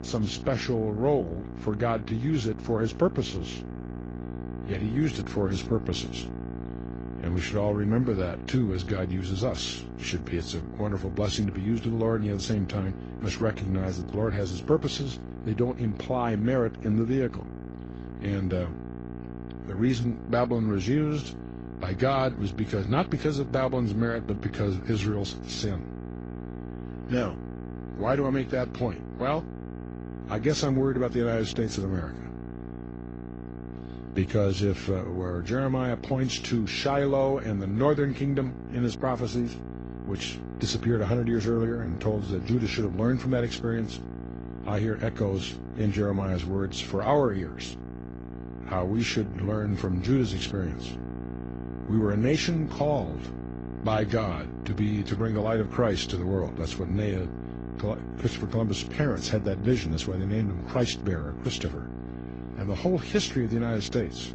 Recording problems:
garbled, watery; slightly; nothing above 7 kHz
electrical hum; noticeable; throughout; 60 Hz, 10 dB below the speech

